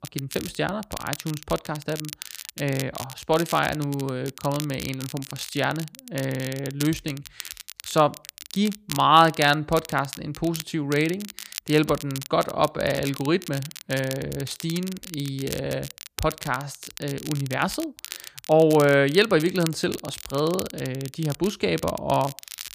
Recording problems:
crackle, like an old record; noticeable; 15 dB below the speech

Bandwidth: 15 kHz